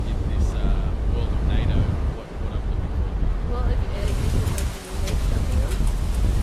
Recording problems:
garbled, watery; slightly
rain or running water; very loud; throughout; 4 dB above the speech
wind noise on the microphone; heavy; 1 dB above the speech

